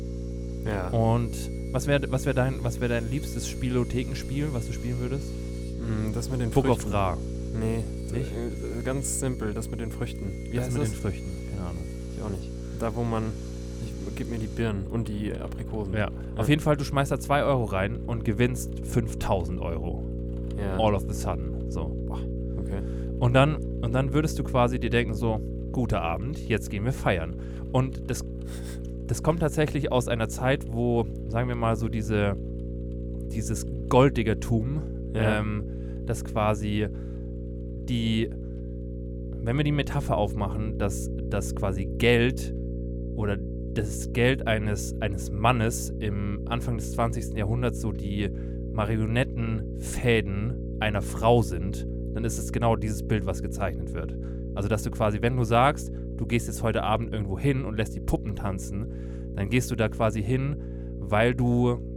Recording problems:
electrical hum; noticeable; throughout; 60 Hz, 15 dB below the speech
machinery noise; faint; throughout; 25 dB below the speech

